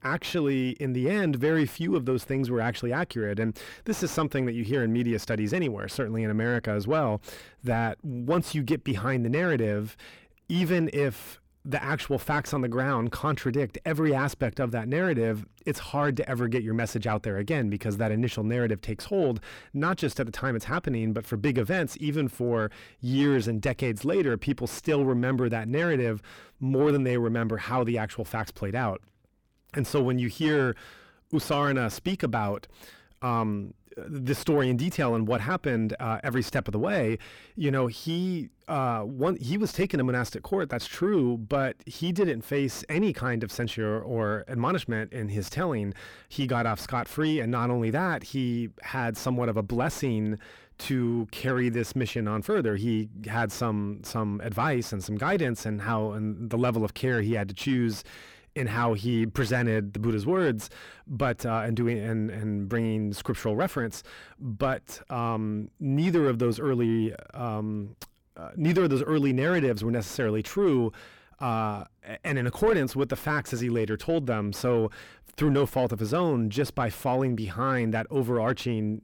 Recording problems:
distortion; slight; 10 dB below the speech

